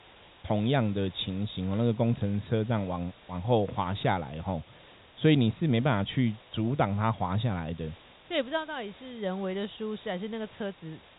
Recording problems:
high frequencies cut off; severe; nothing above 4 kHz
hiss; faint; throughout; 25 dB below the speech

